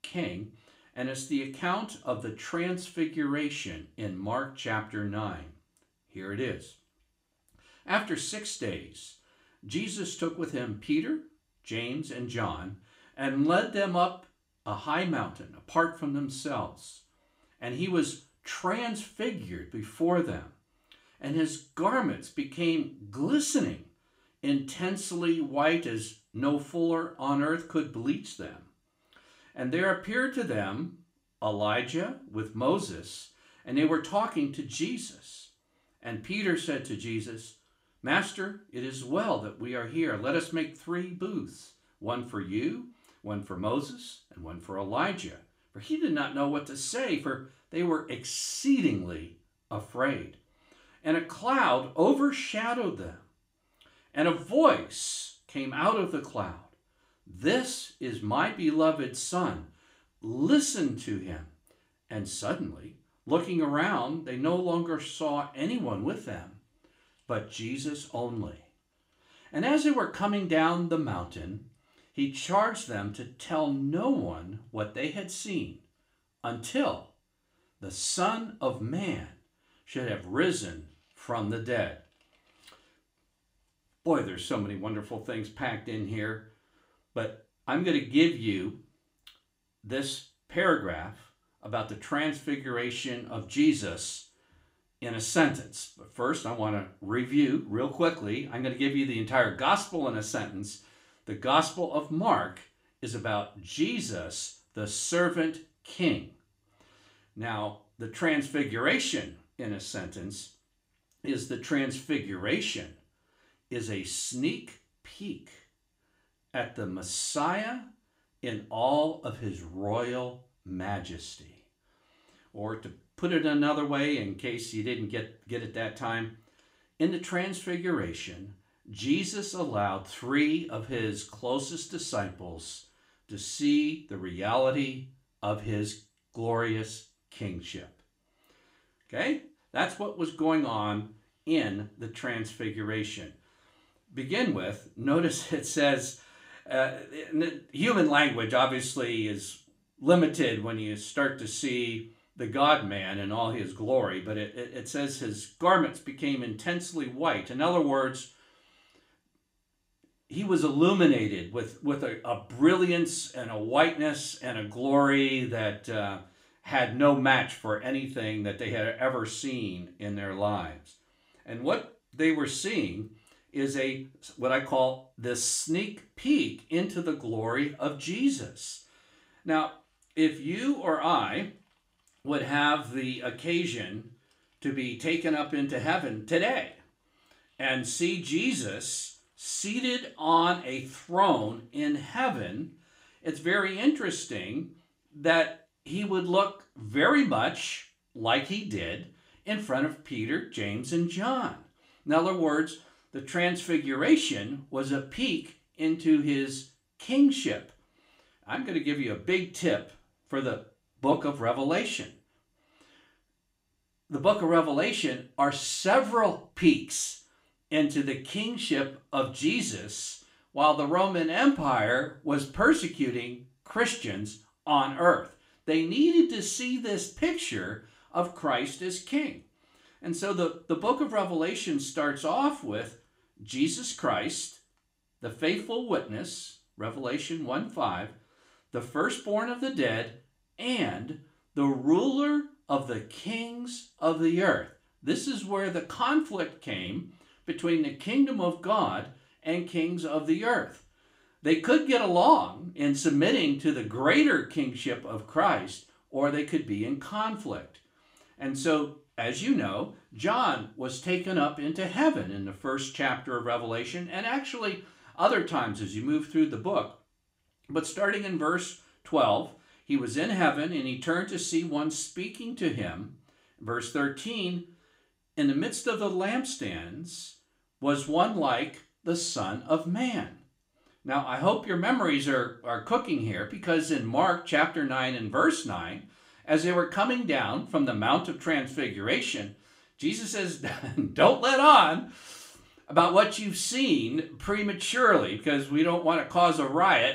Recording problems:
room echo; very slight; dies away in 0.3 s
off-mic speech; somewhat distant

